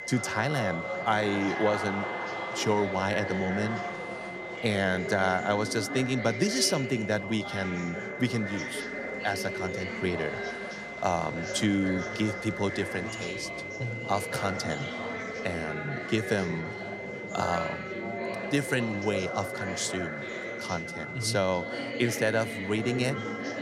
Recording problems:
high-pitched whine; loud; throughout; 2 kHz, 9 dB below the speech
chatter from many people; loud; throughout; 6 dB below the speech

